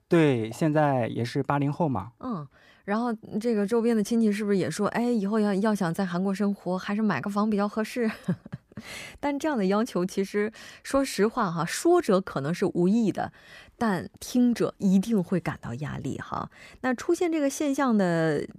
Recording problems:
none

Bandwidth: 15 kHz